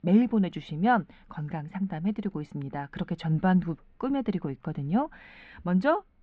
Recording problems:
muffled; slightly; fading above 3.5 kHz

